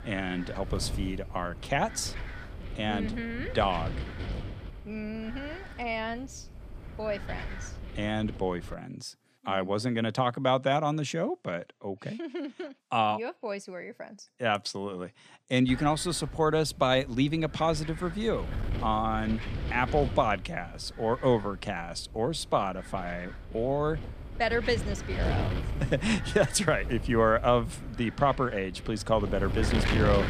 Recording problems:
wind noise on the microphone; occasional gusts; until 8.5 s and from 16 s on; 10 dB below the speech

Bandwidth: 14.5 kHz